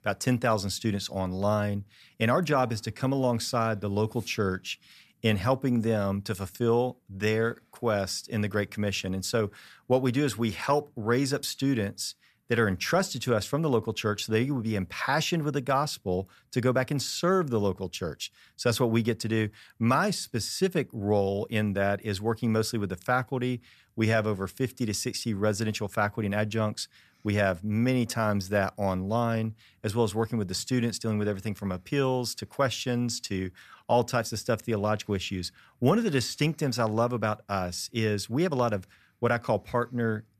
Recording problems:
none

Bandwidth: 14.5 kHz